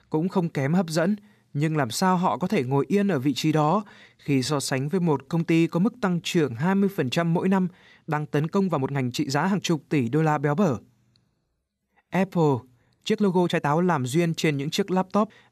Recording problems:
uneven, jittery; strongly; from 3.5 to 14 s

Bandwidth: 14.5 kHz